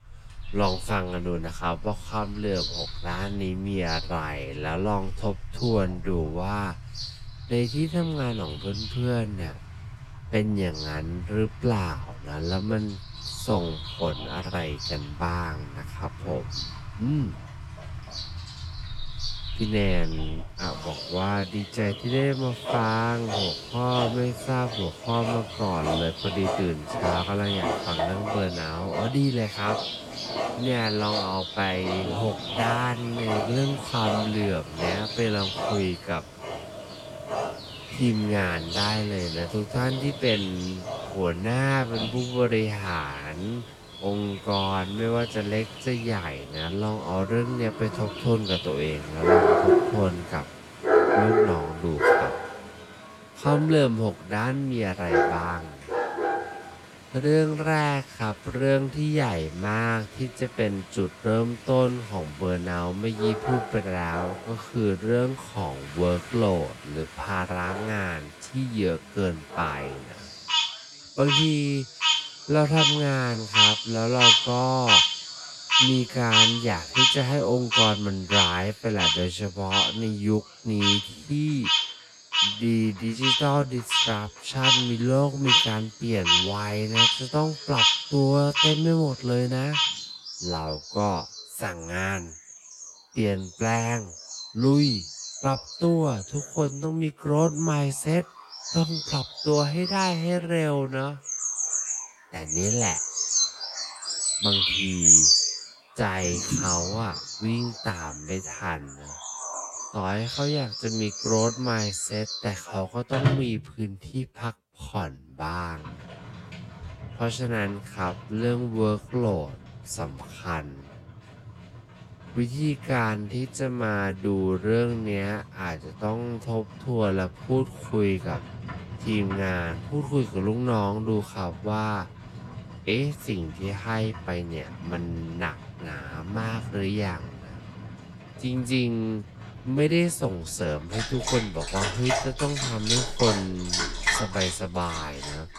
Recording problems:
wrong speed, natural pitch; too slow; 0.5 times normal speed
animal sounds; very loud; throughout; 2 dB above the speech

